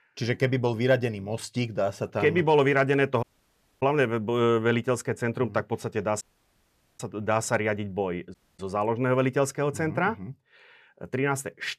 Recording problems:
audio cutting out; at 3 s for 0.5 s, at 6 s for 1 s and at 8.5 s

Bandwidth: 14.5 kHz